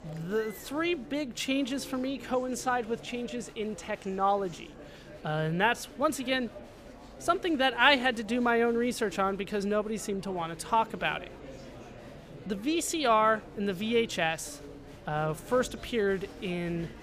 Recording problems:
murmuring crowd; noticeable; throughout; 20 dB below the speech

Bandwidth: 15 kHz